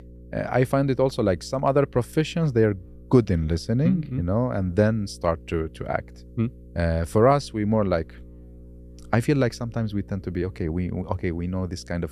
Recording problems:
electrical hum; faint; throughout; 60 Hz, 30 dB below the speech

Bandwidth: 14 kHz